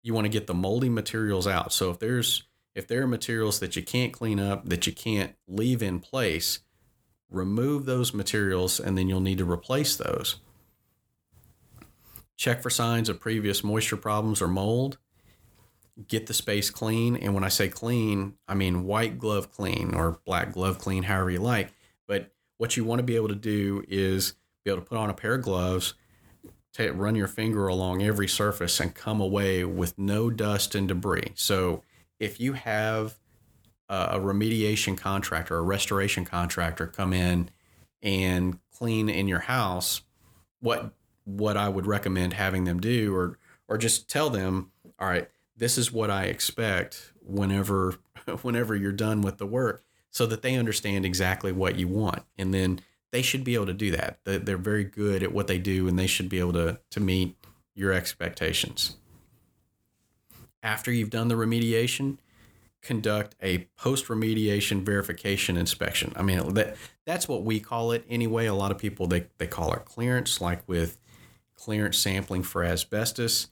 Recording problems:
none

